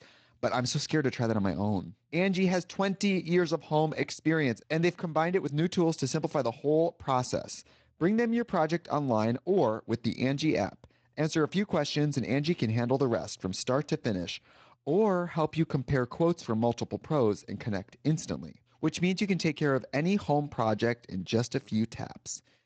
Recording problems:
garbled, watery; slightly; nothing above 7.5 kHz

